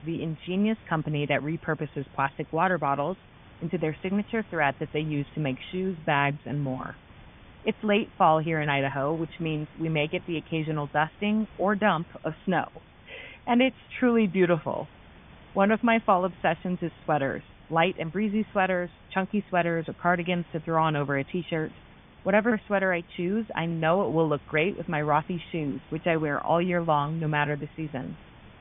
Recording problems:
high frequencies cut off; severe; nothing above 3.5 kHz
hiss; faint; throughout; 25 dB below the speech

